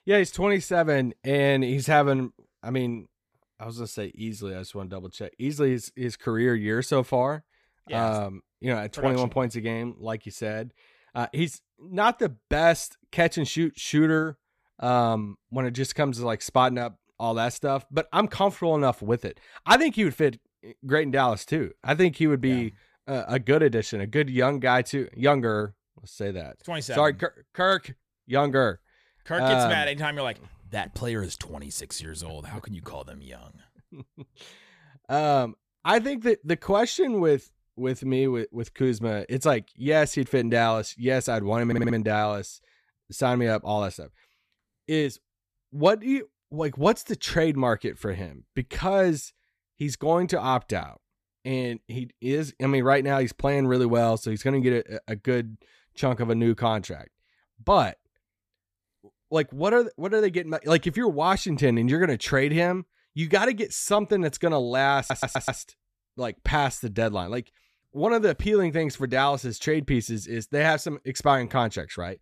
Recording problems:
audio stuttering; at 42 s and at 1:05

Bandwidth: 14.5 kHz